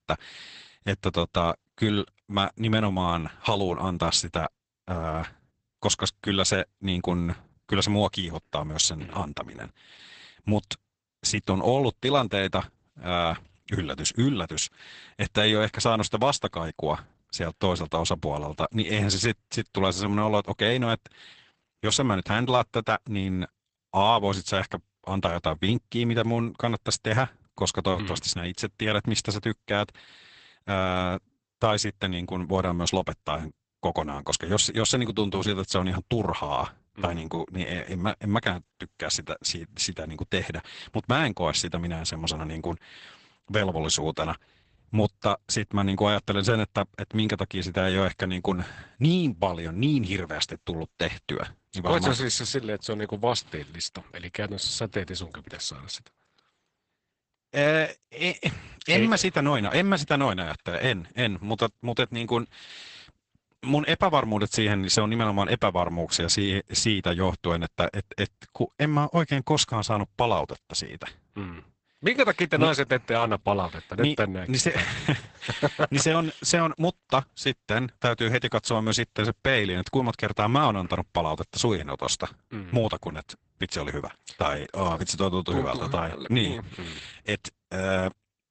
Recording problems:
garbled, watery; badly; nothing above 8 kHz

